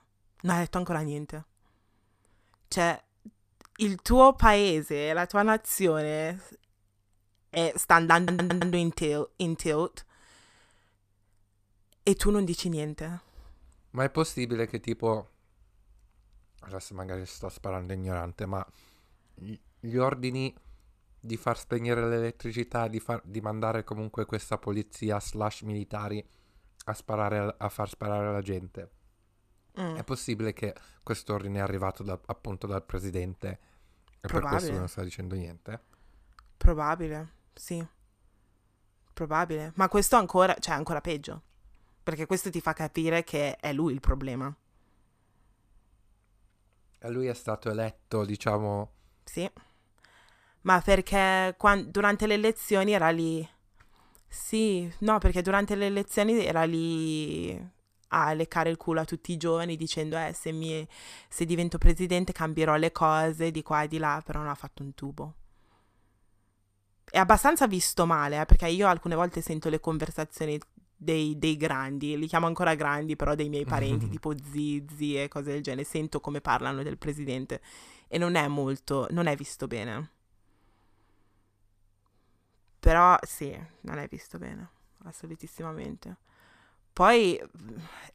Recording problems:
audio stuttering; at 8 s

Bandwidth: 14.5 kHz